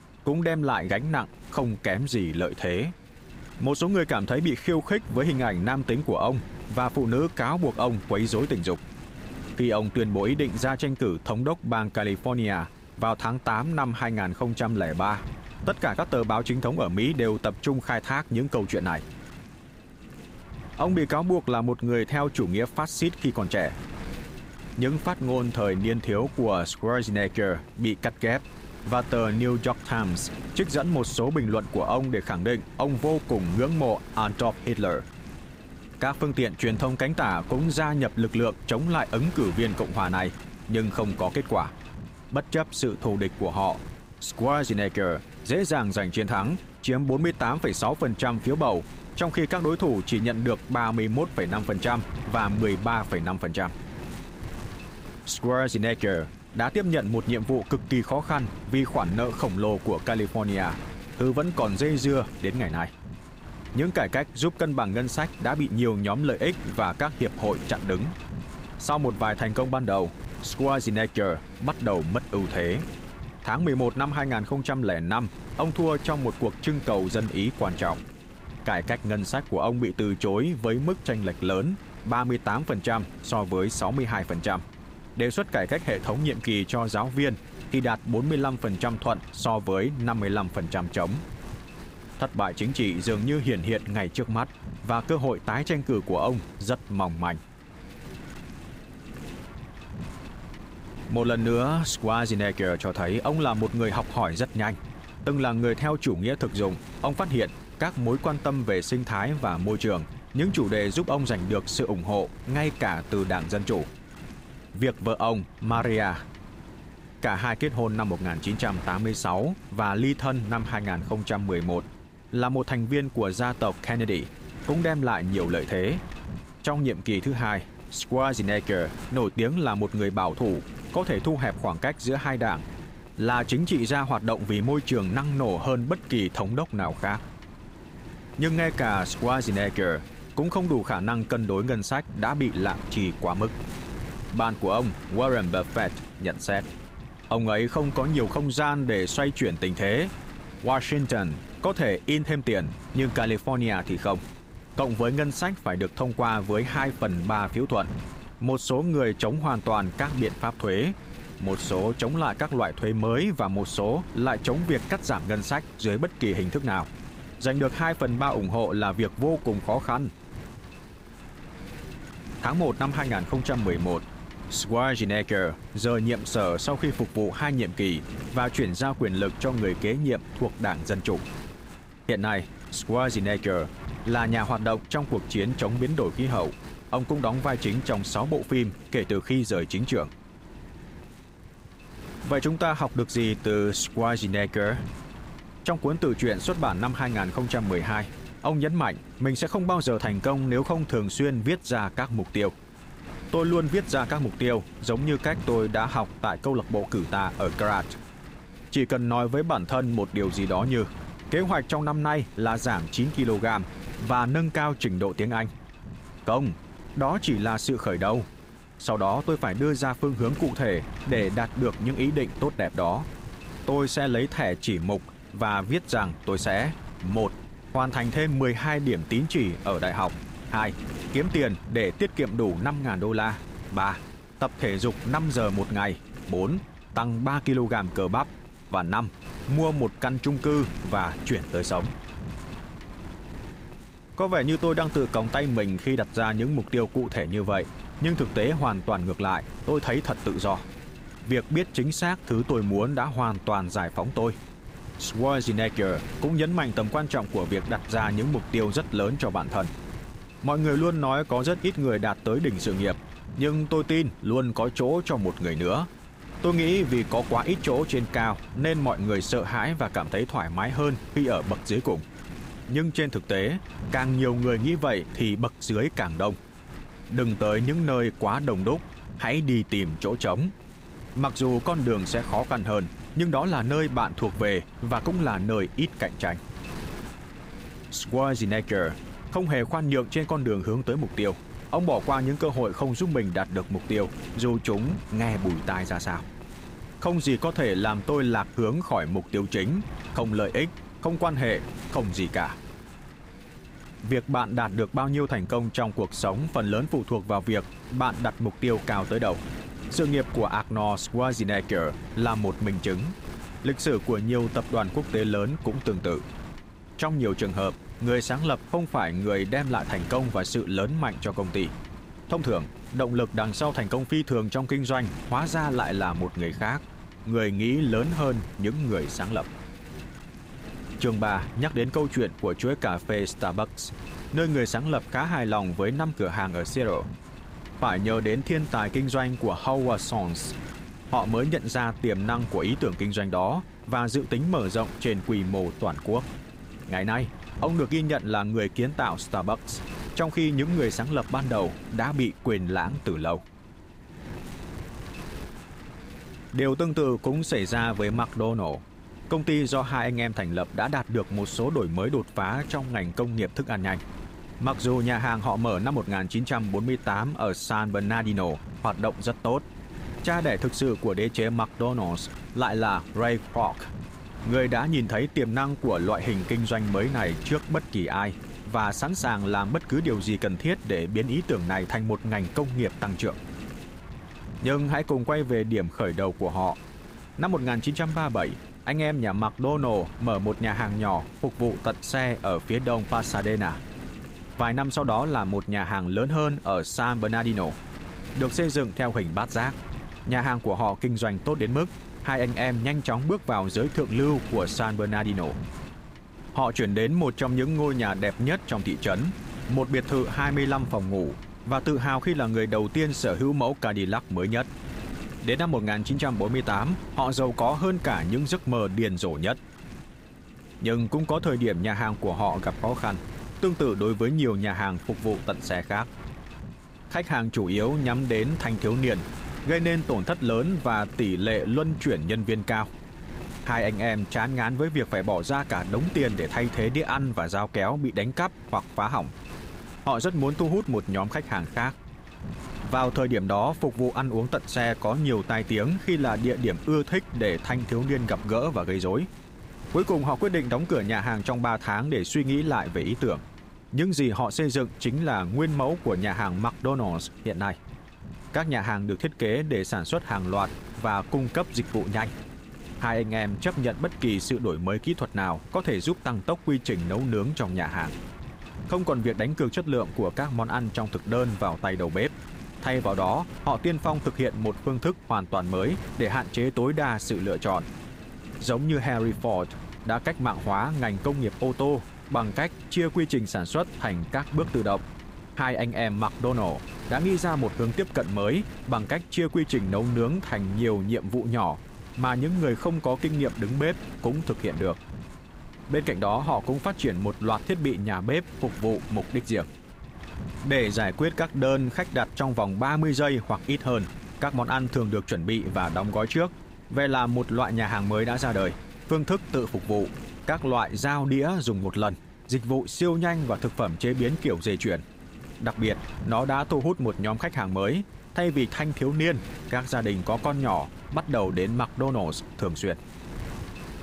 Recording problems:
wind noise on the microphone; occasional gusts; 15 dB below the speech

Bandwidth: 15.5 kHz